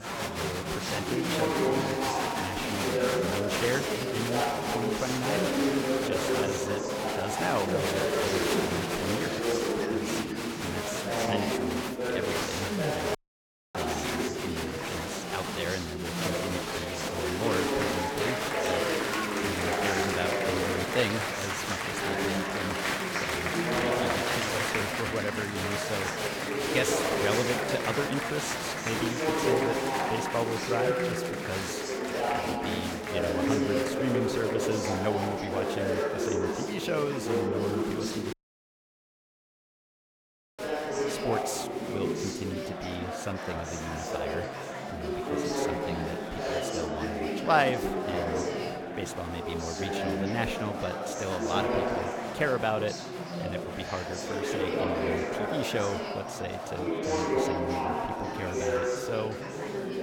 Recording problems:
chatter from many people; very loud; throughout; 5 dB above the speech
audio cutting out; at 13 s for 0.5 s and at 38 s for 2.5 s

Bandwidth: 17.5 kHz